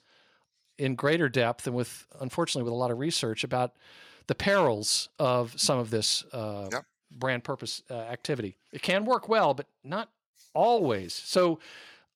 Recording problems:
none

